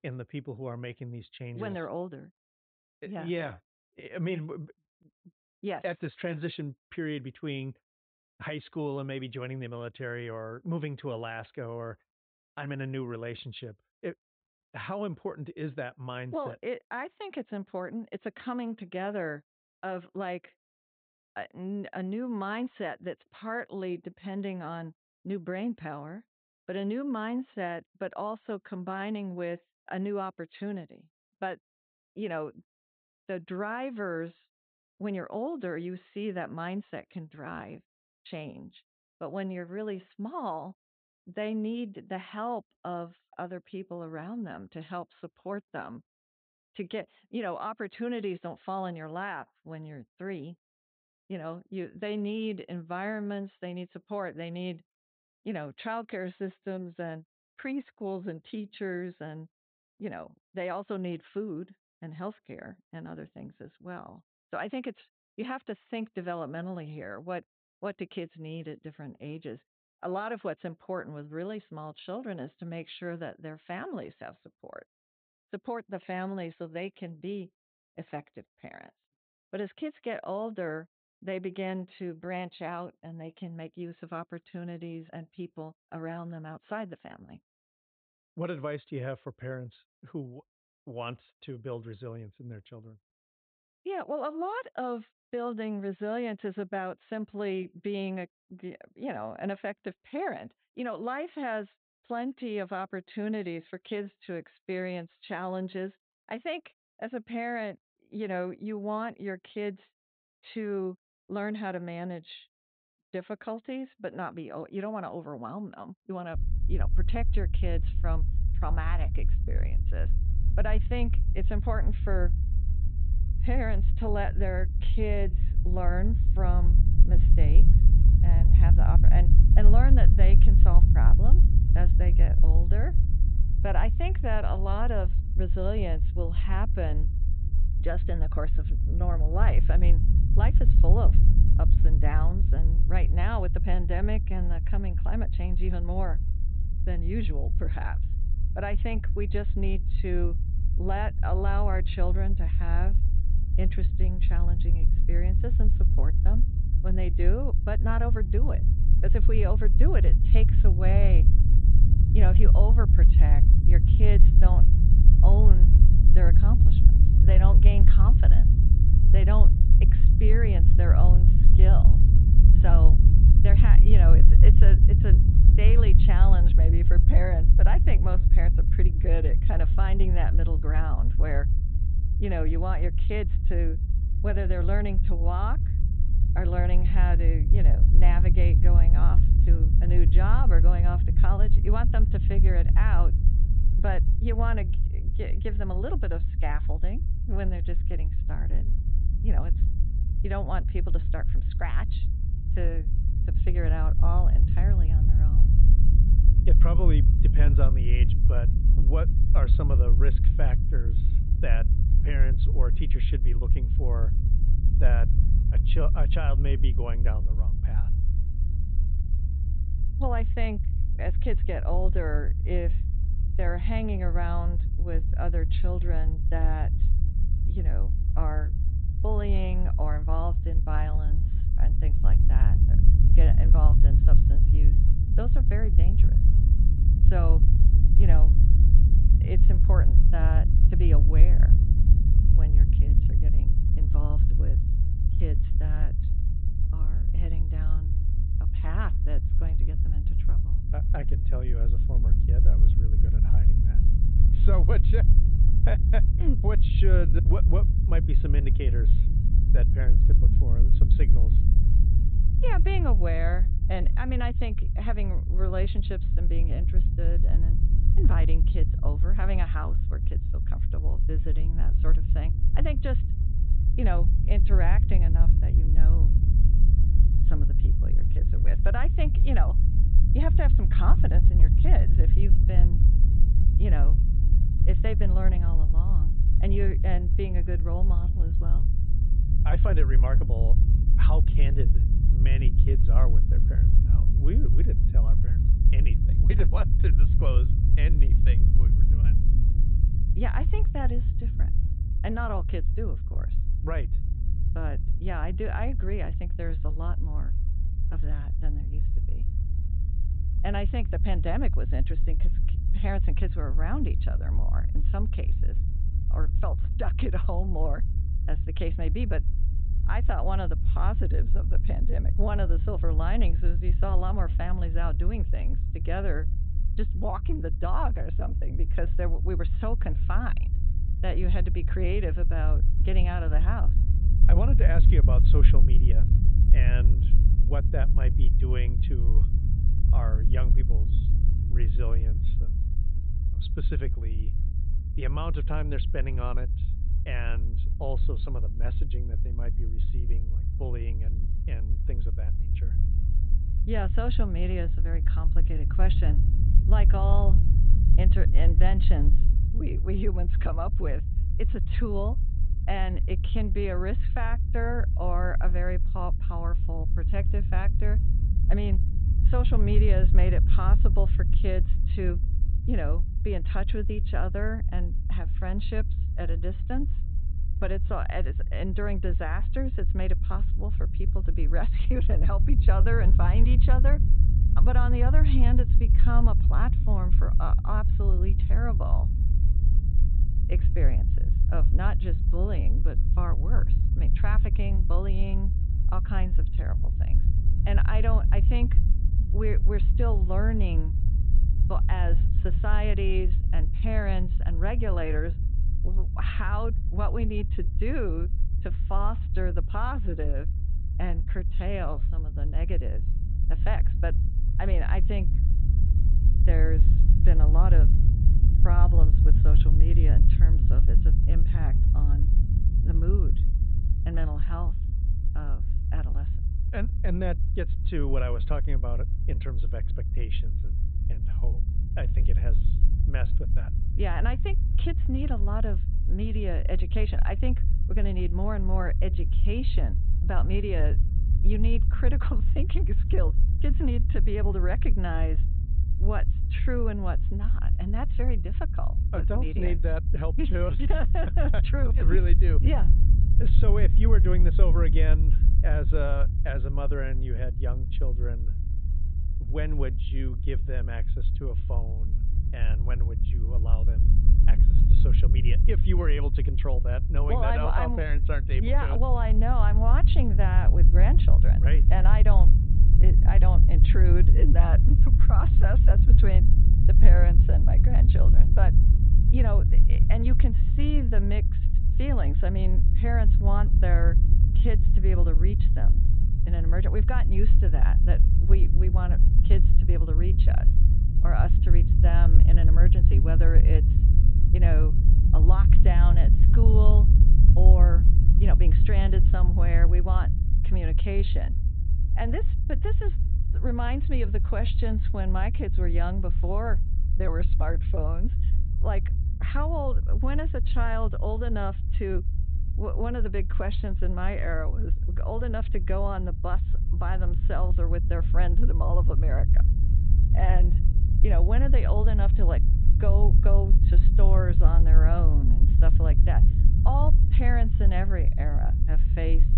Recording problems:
high frequencies cut off; severe; nothing above 4 kHz
low rumble; loud; from 1:56 on; 6 dB below the speech

